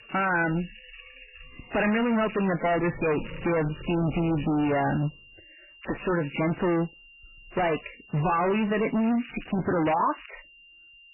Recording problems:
distortion; heavy; 26% of the sound clipped
garbled, watery; badly; nothing above 3 kHz
animal sounds; noticeable; until 4.5 s; 20 dB below the speech
crackling; noticeable; from 2.5 to 4.5 s, at 6 s and from 9 to 10 s; 20 dB below the speech
high-pitched whine; faint; throughout; 3 kHz, 25 dB below the speech

